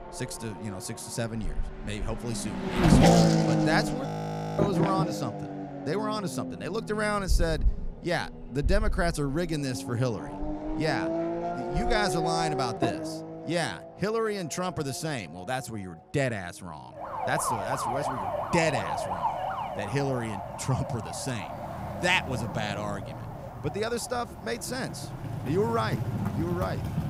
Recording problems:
traffic noise; very loud; throughout; 1 dB above the speech
audio freezing; at 4 s for 0.5 s

